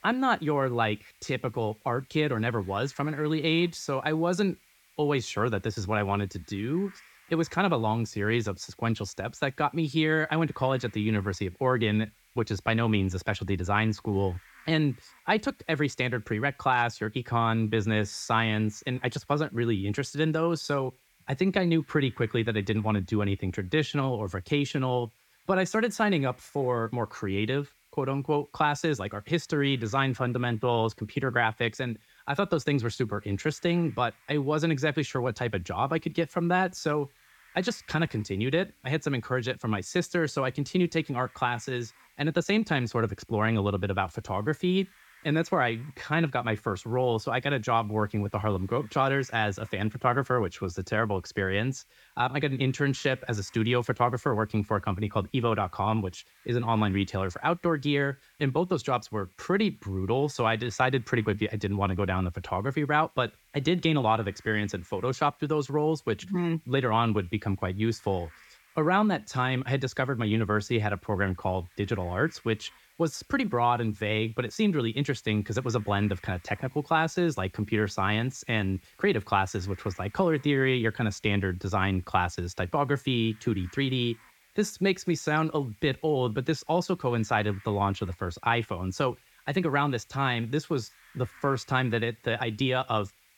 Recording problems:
hiss; faint; throughout; 30 dB below the speech

